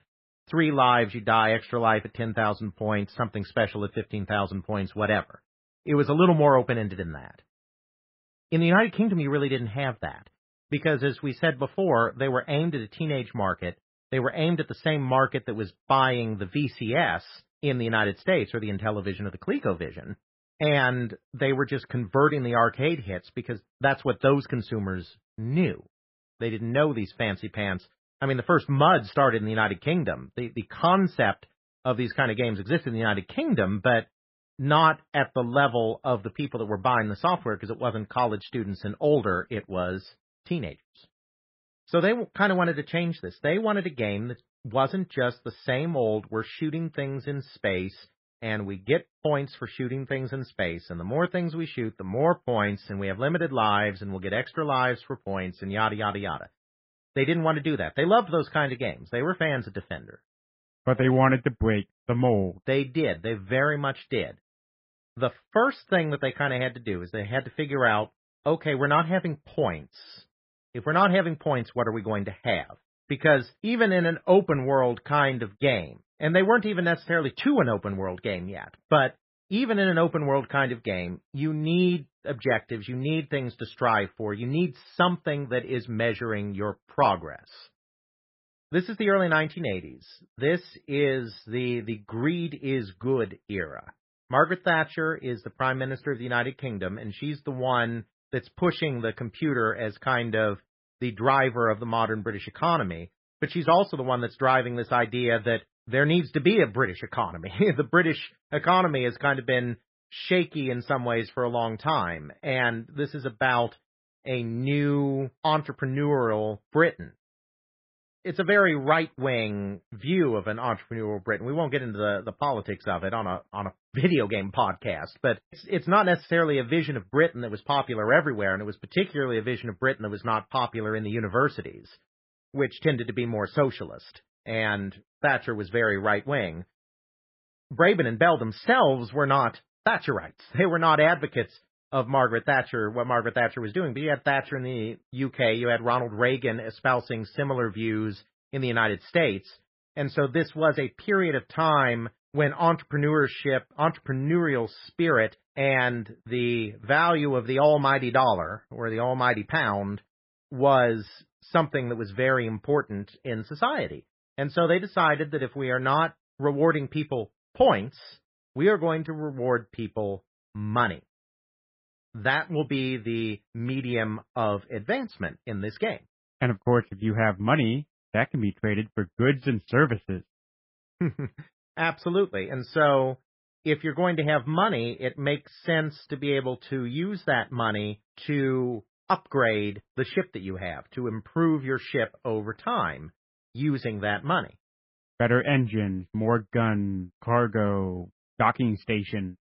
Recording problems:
garbled, watery; badly; nothing above 5.5 kHz
muffled; very slightly; fading above 2 kHz

